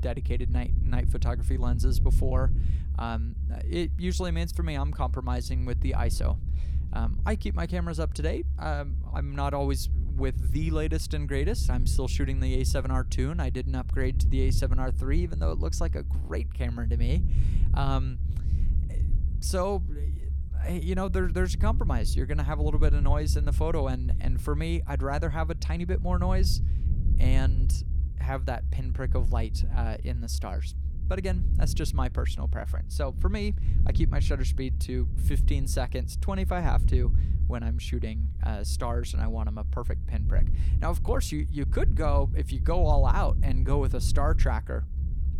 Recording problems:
low rumble; noticeable; throughout; 10 dB below the speech

